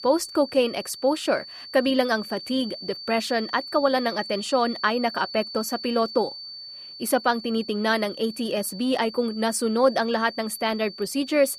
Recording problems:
high-pitched whine; noticeable; throughout; 4.5 kHz, 10 dB below the speech

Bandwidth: 14.5 kHz